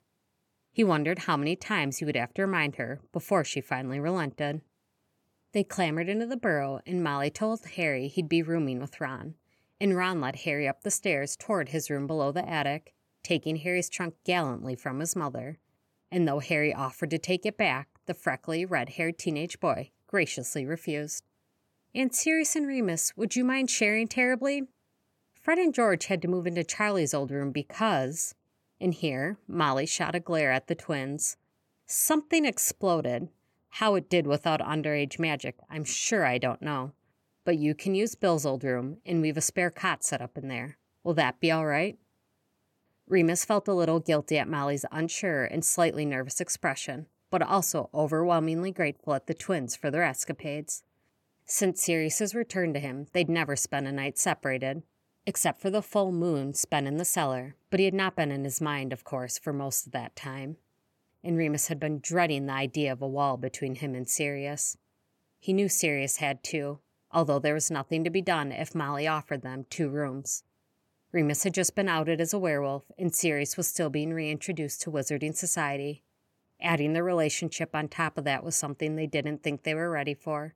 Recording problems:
none

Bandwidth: 17 kHz